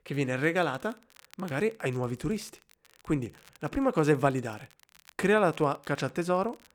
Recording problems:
crackle, like an old record; faint; 30 dB below the speech

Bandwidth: 19 kHz